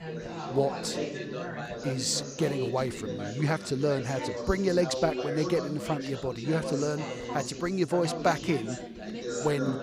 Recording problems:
background chatter; loud; throughout; 3 voices, 6 dB below the speech

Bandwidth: 15.5 kHz